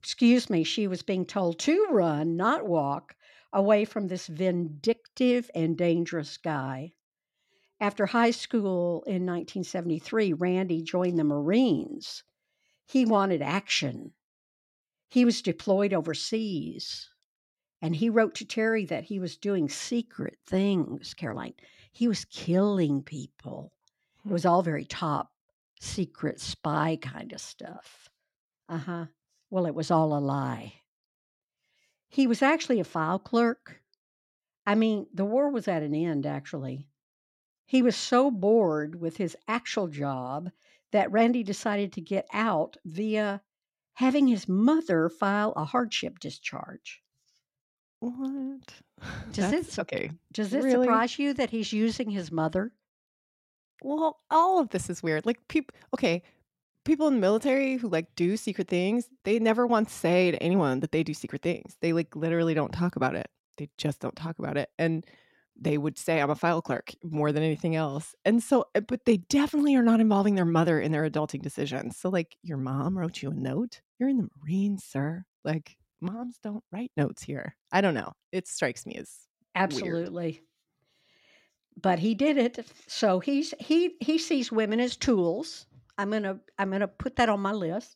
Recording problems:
none

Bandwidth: 16 kHz